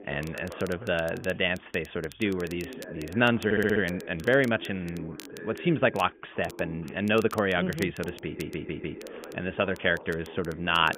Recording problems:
high frequencies cut off; severe; nothing above 3.5 kHz
voice in the background; noticeable; throughout; 15 dB below the speech
crackle, like an old record; faint; 20 dB below the speech
audio stuttering; at 3.5 s and at 8 s

